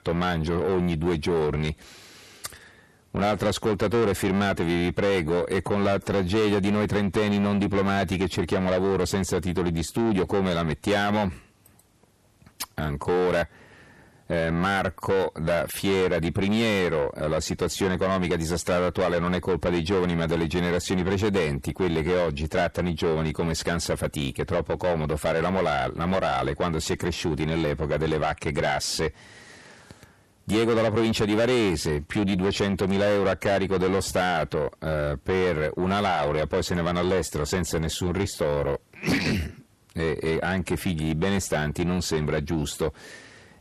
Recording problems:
distortion; heavy; 7 dB below the speech

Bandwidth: 13.5 kHz